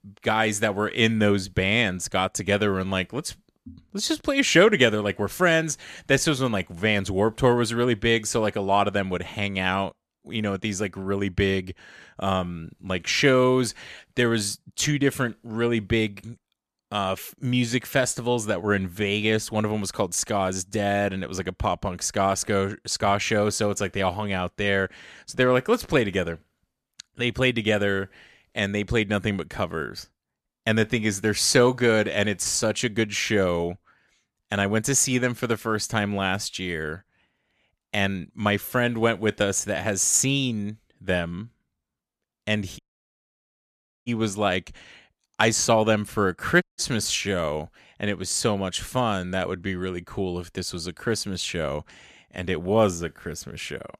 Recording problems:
audio cutting out; at 43 s for 1.5 s and at 47 s

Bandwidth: 14.5 kHz